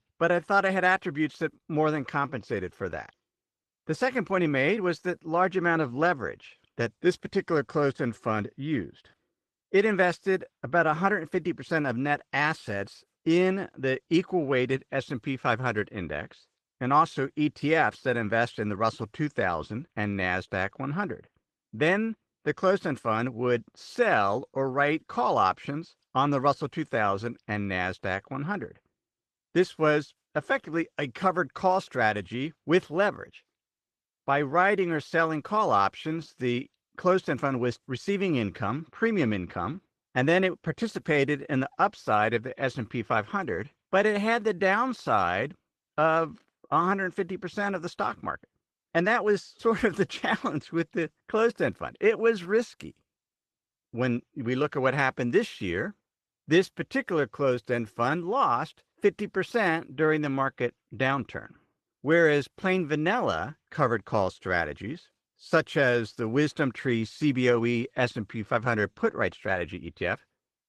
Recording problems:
garbled, watery; slightly; nothing above 13.5 kHz

